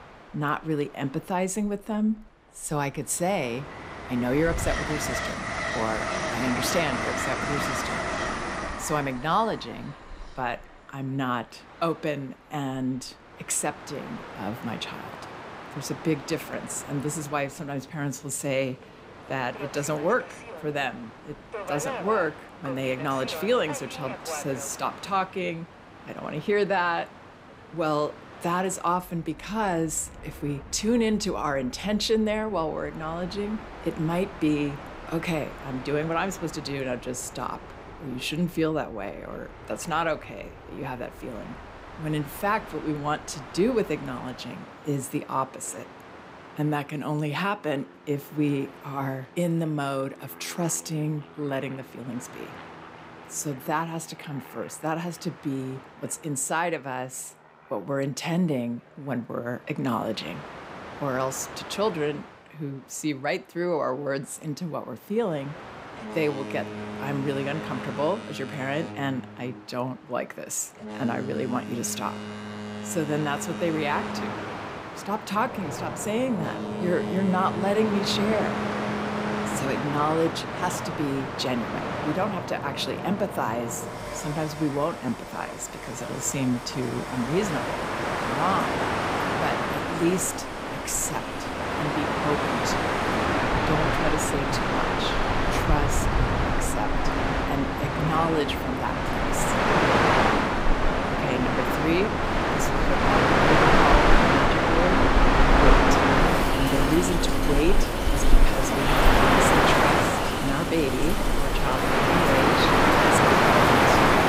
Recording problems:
train or aircraft noise; very loud; throughout; 4 dB above the speech
rain or running water; loud; from 1:15 on; 7 dB below the speech

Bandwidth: 15.5 kHz